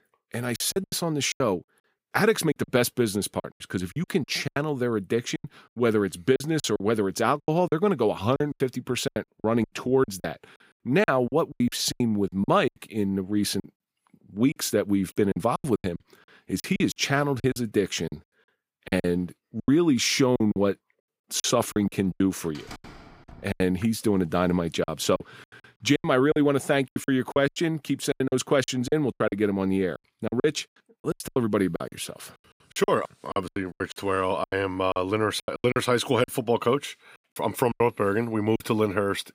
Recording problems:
choppy; very; 15% of the speech affected
door banging; faint; at 23 s; peak 15 dB below the speech

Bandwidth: 15.5 kHz